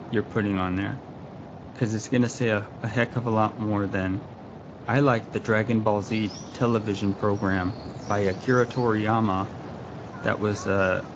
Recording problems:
garbled, watery; slightly; nothing above 7.5 kHz
animal sounds; noticeable; from 6 s on; 20 dB below the speech
wind noise on the microphone; occasional gusts; 15 dB below the speech

